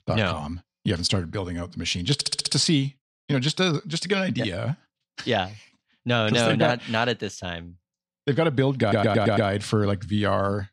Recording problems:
audio stuttering; at 2 s and at 9 s

